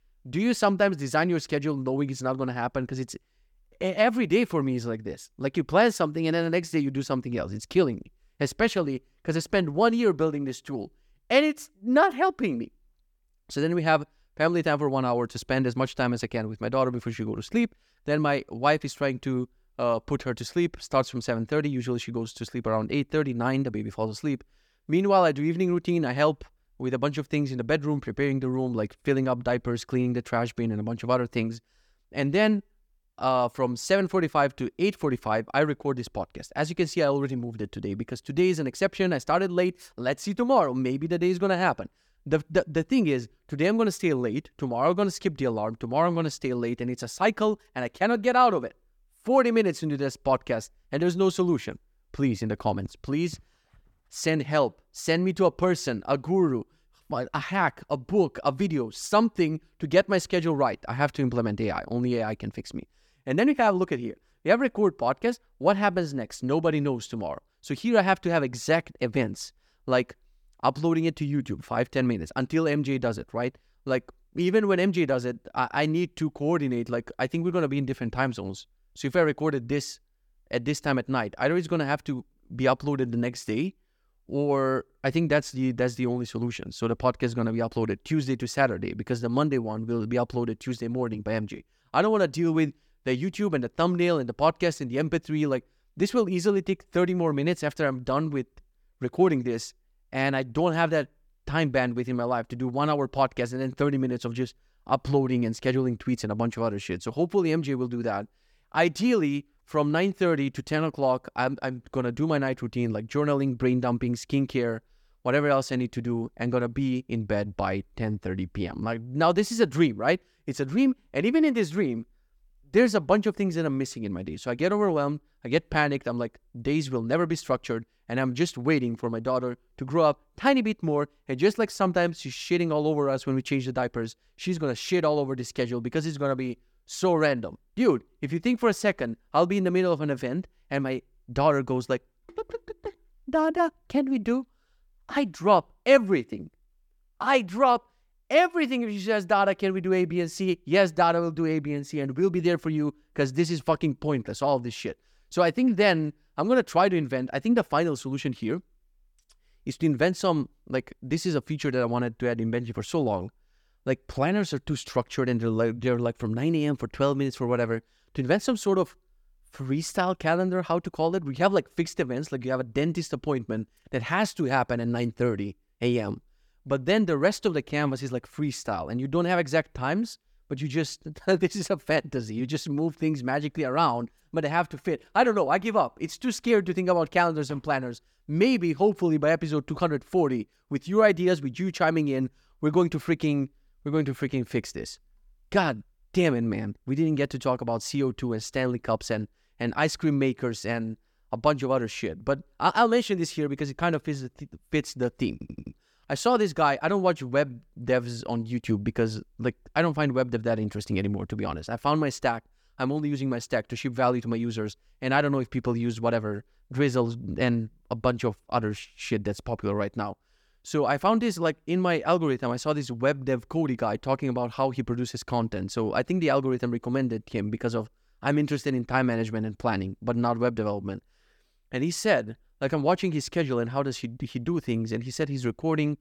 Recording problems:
audio stuttering; at 3:25

